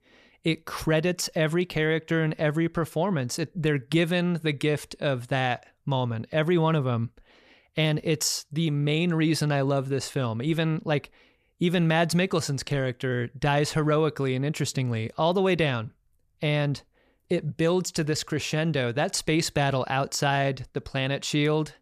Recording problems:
none

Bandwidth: 14.5 kHz